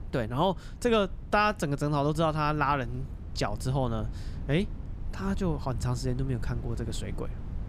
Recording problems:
wind noise on the microphone; occasional gusts; 20 dB below the speech

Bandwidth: 15.5 kHz